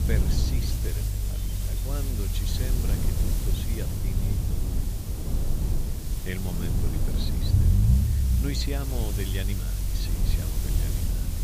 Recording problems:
hiss; loud; throughout; 2 dB below the speech
low rumble; loud; throughout; 2 dB below the speech
animal sounds; faint; throughout; 20 dB below the speech

